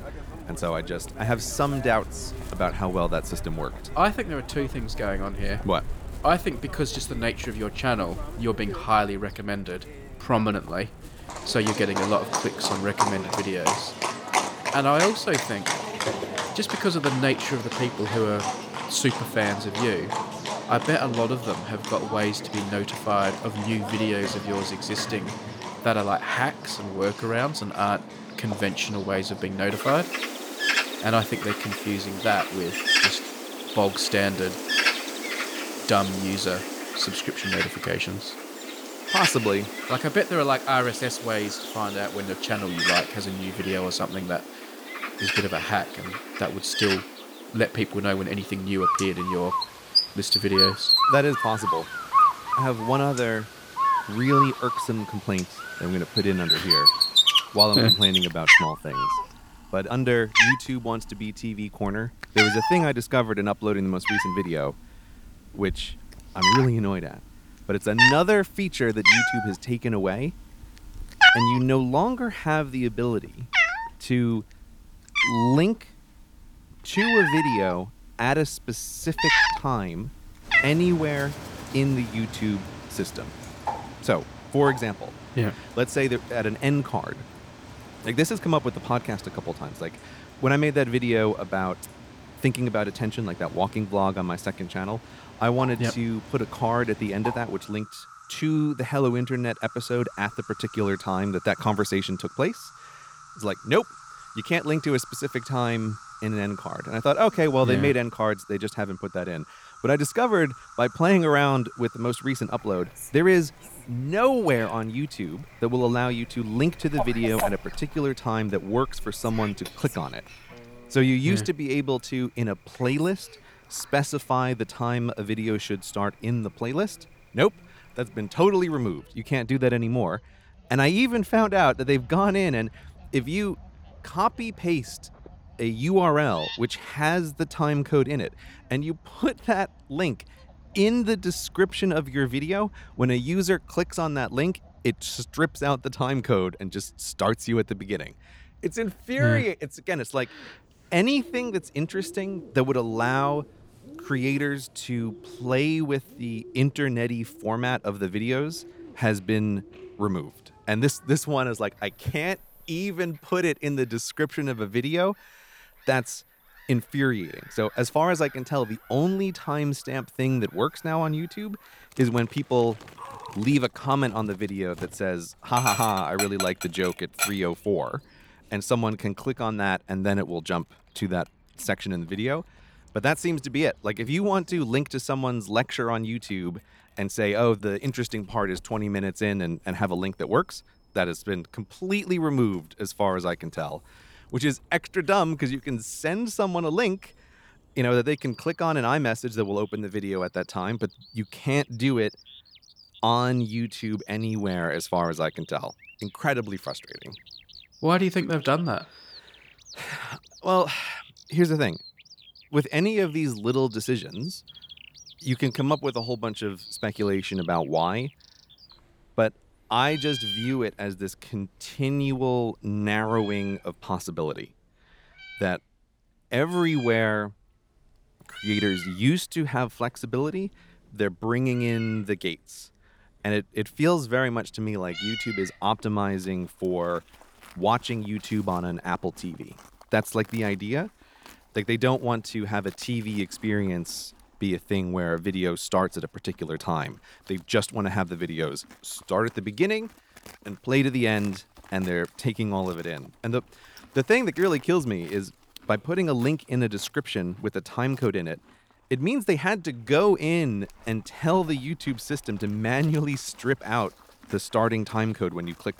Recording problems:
animal sounds; very loud; throughout; as loud as the speech

